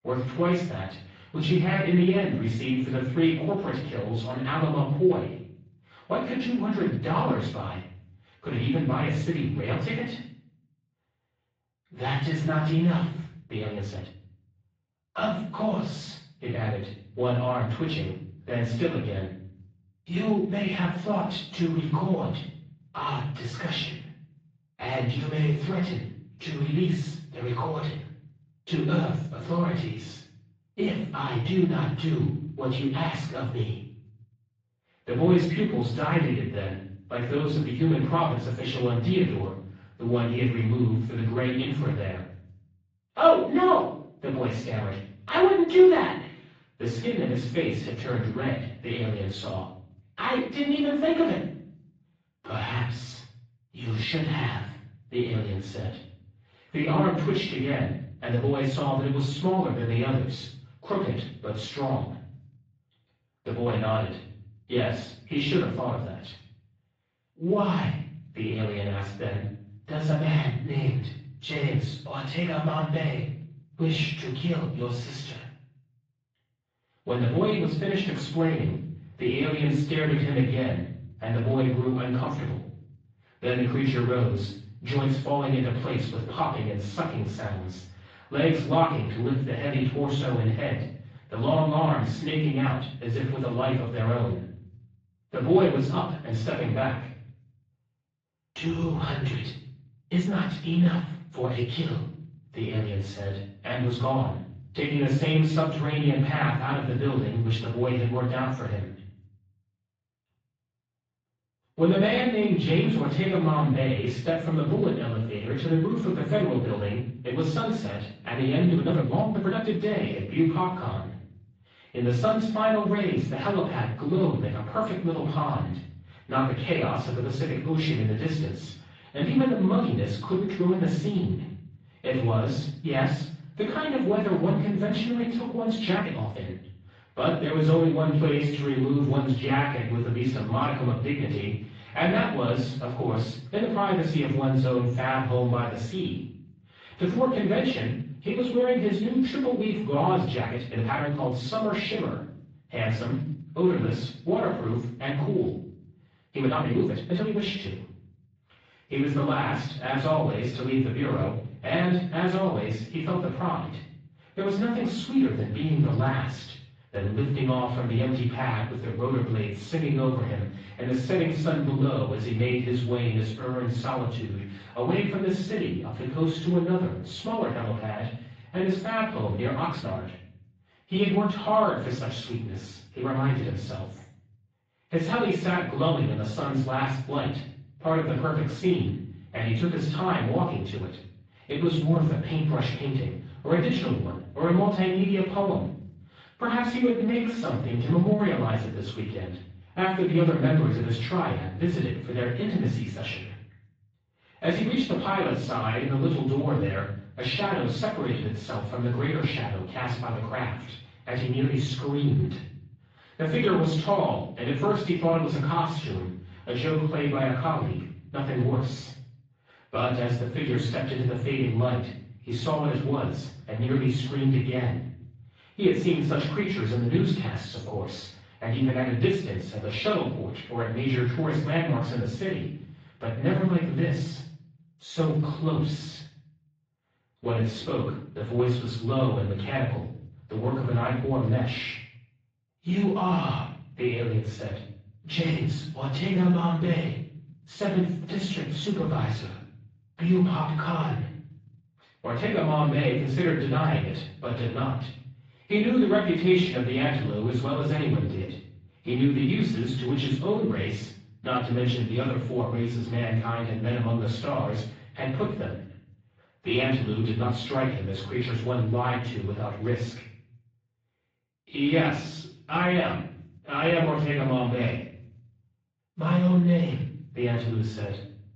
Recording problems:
off-mic speech; far
room echo; noticeable; dies away in 0.6 s
garbled, watery; slightly; nothing above 7.5 kHz
muffled; very slightly; fading above 3.5 kHz
uneven, jittery; strongly; from 13 s to 4:36

